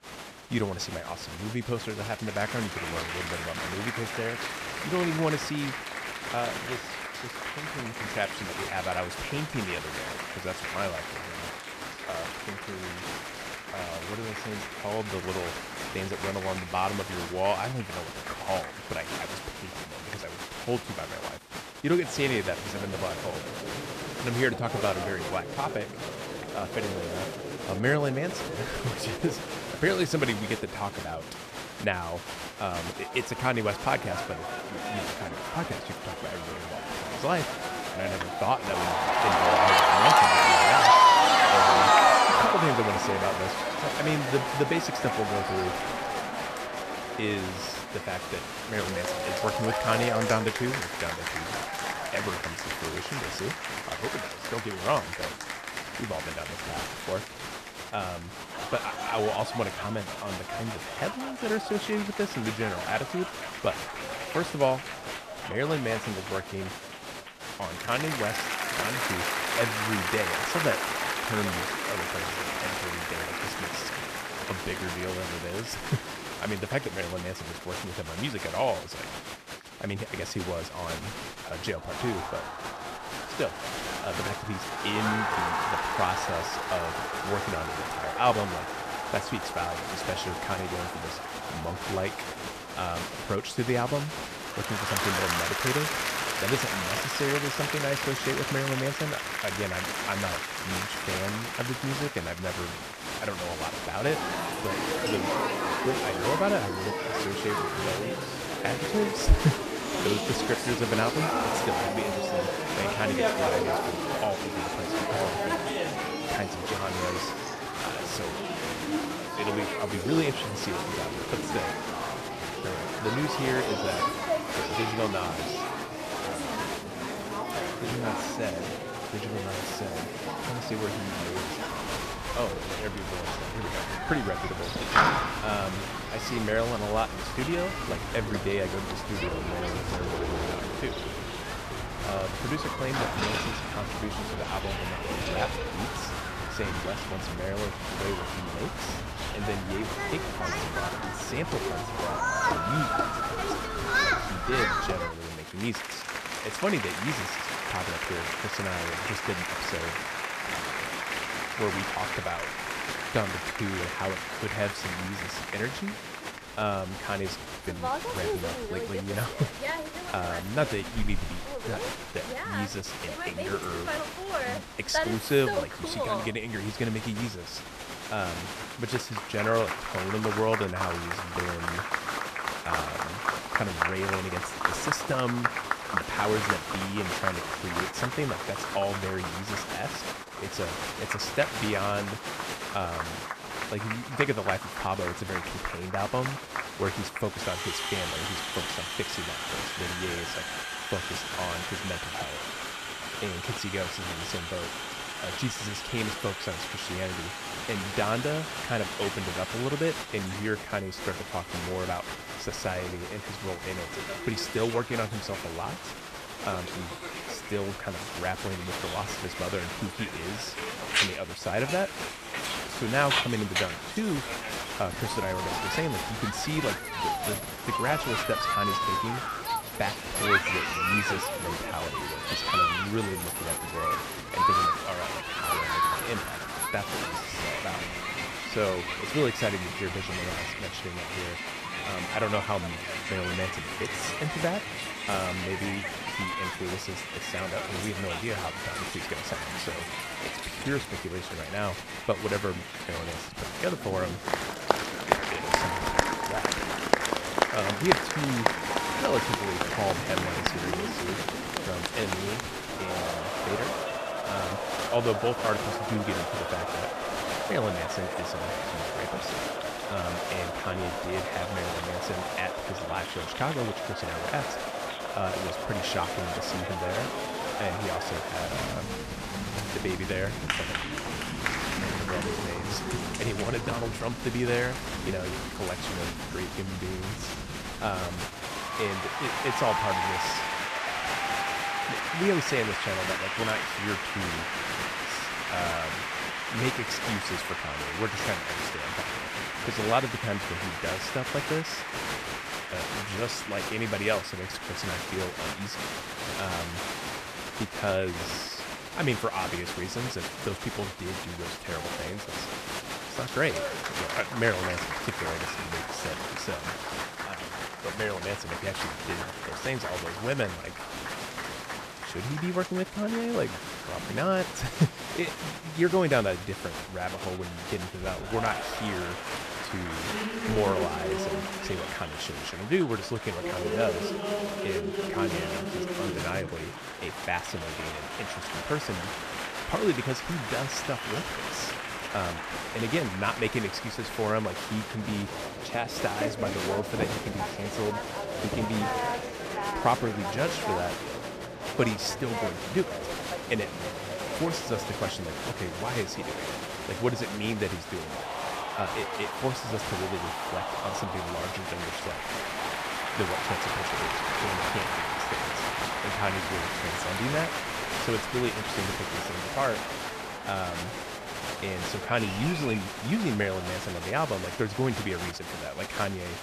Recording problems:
crowd noise; very loud; throughout; 2 dB above the speech

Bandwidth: 14.5 kHz